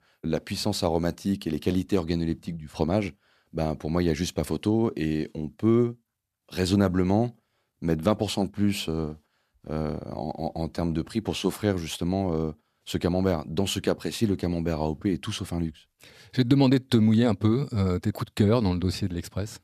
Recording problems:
none

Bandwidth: 14.5 kHz